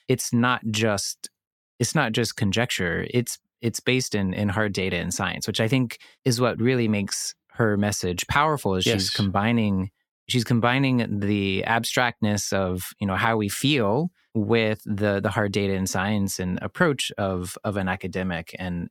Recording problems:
none

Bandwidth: 17 kHz